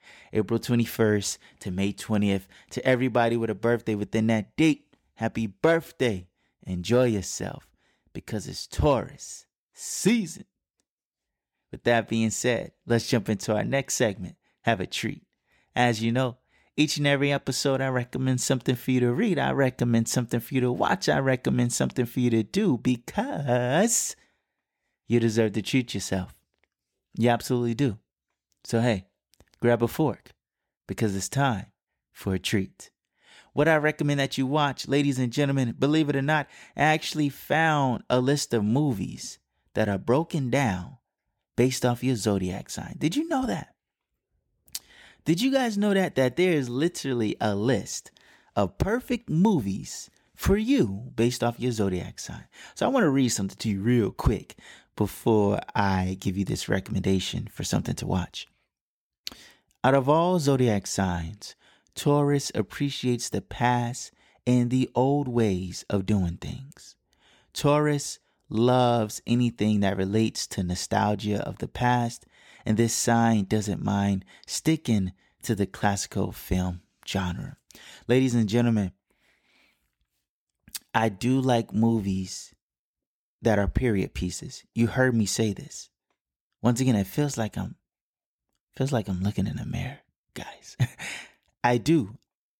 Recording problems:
none

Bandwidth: 17 kHz